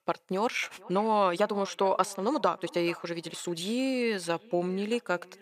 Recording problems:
echo of what is said; faint; throughout; 600 ms later, 20 dB below the speech
thin; very slightly; fading below 1 kHz
uneven, jittery; strongly; from 0.5 to 4.5 s

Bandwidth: 14.5 kHz